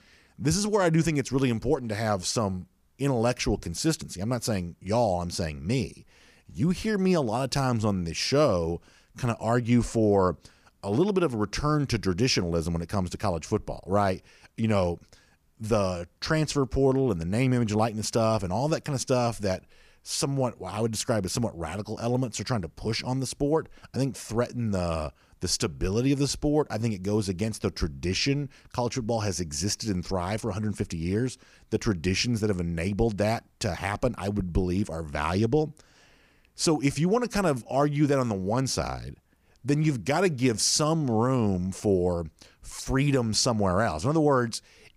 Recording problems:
none

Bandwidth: 15 kHz